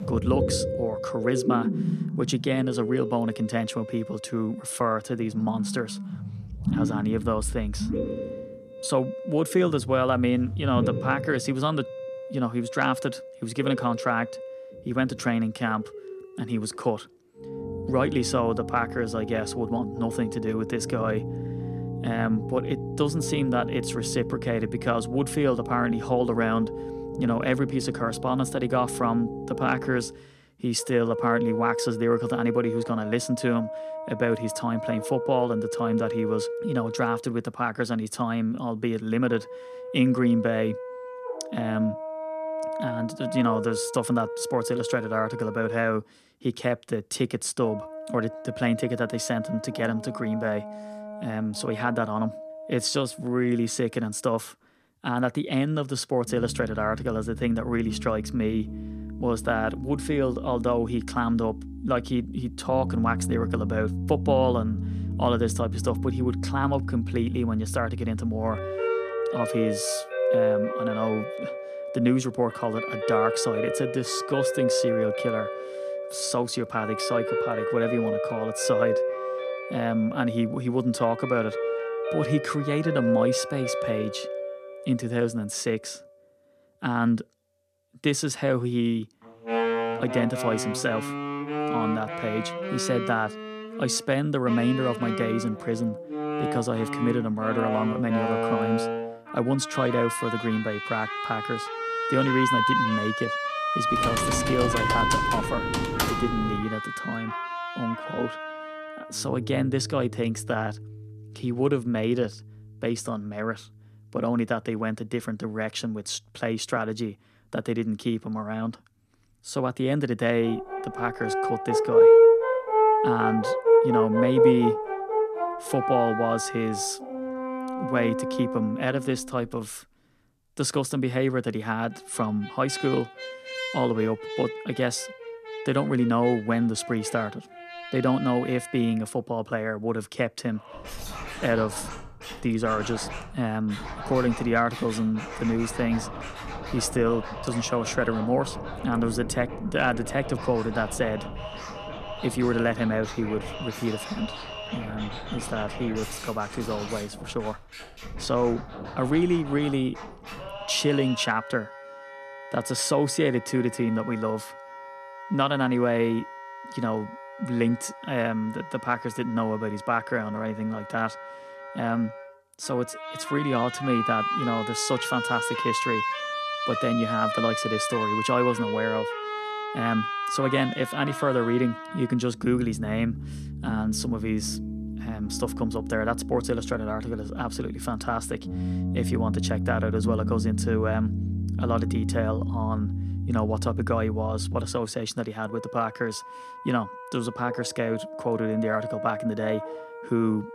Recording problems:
background music; loud; throughout; 3 dB below the speech
keyboard typing; loud; from 1:44 to 1:47; peak 1 dB above the speech

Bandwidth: 14.5 kHz